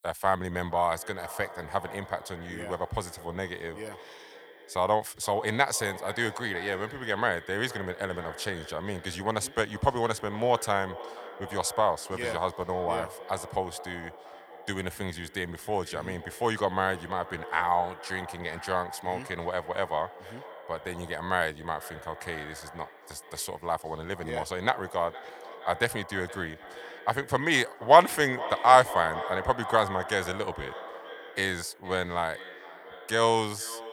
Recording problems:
echo of what is said; noticeable; throughout; 470 ms later, 15 dB below the speech

